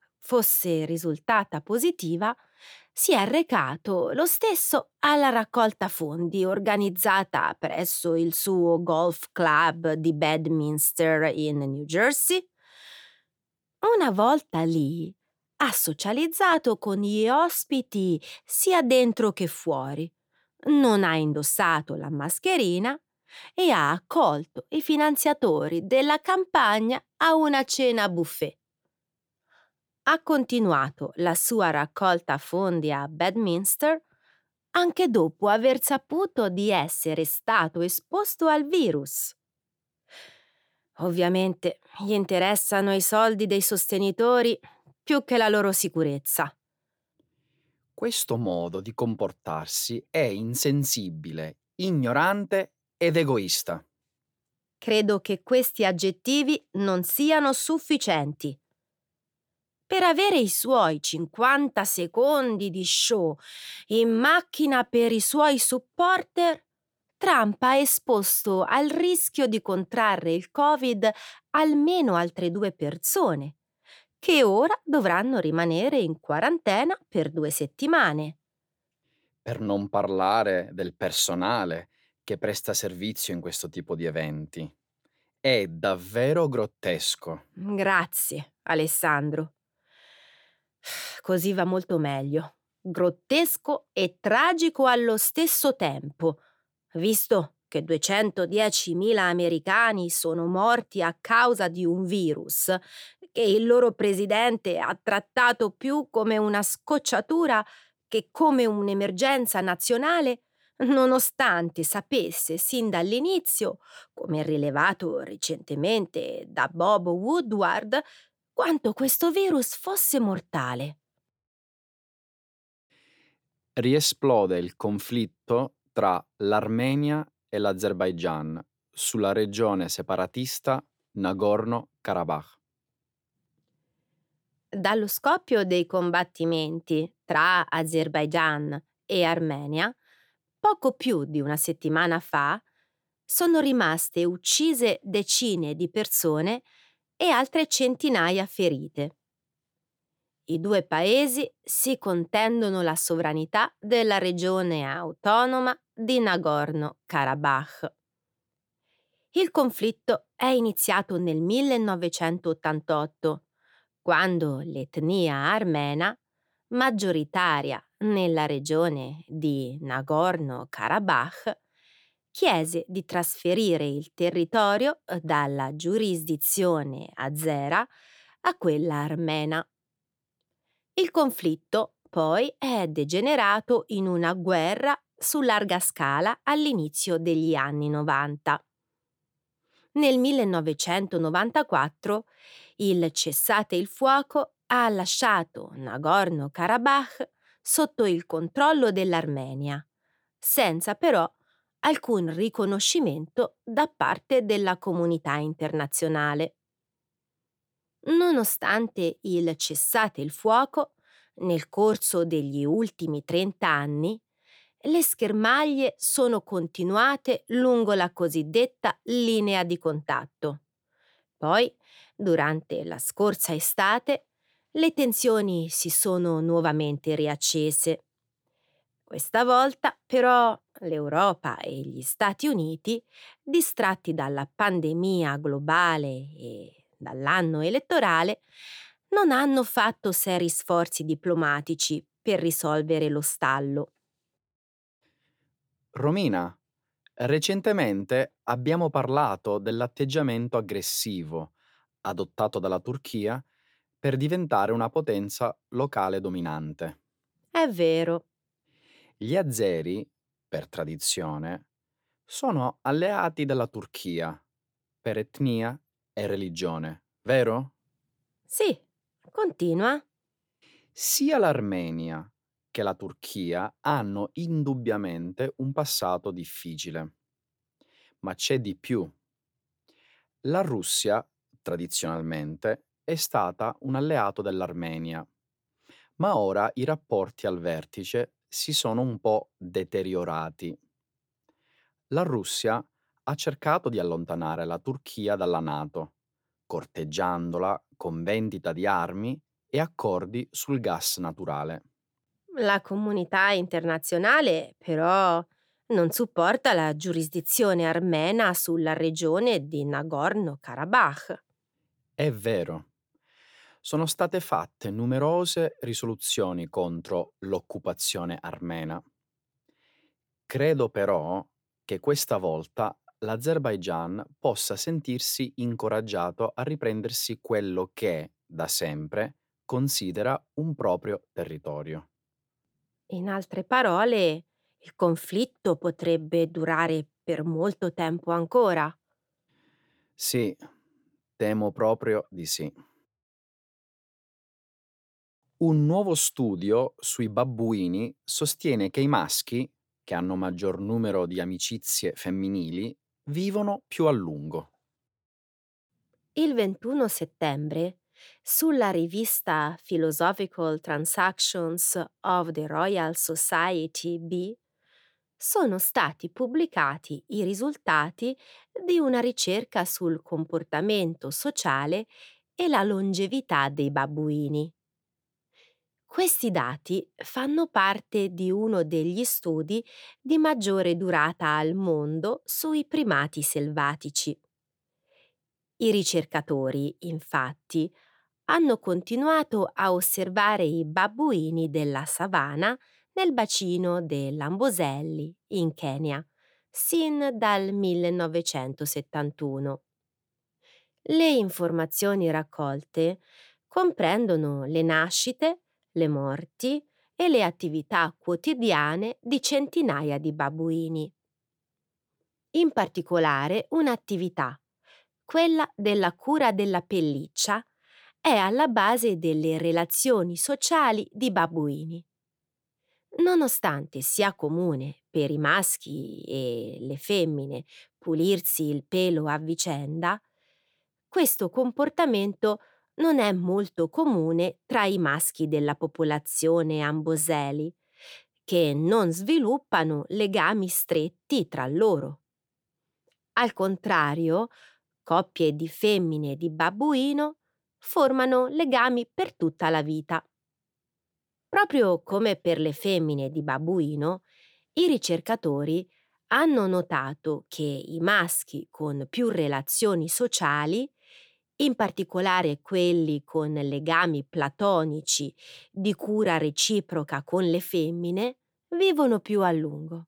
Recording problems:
none

